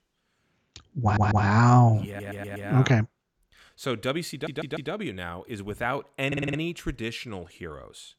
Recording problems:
audio stuttering; 4 times, first at 1 s

